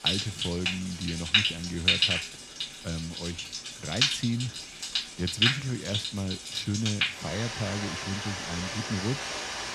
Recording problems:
rain or running water; very loud; throughout; 5 dB above the speech

